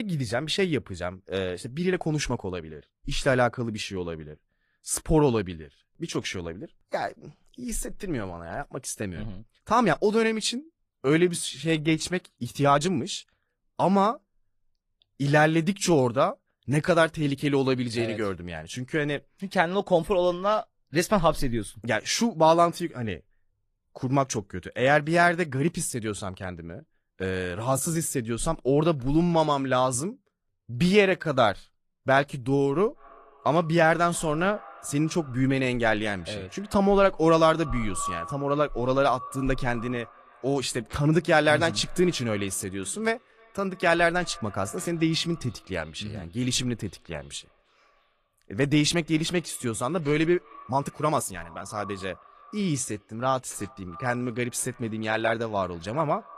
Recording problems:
echo of what is said; faint; from 33 s on; 310 ms later, 20 dB below the speech
garbled, watery; slightly
abrupt cut into speech; at the start
uneven, jittery; strongly; from 2 to 54 s

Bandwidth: 14.5 kHz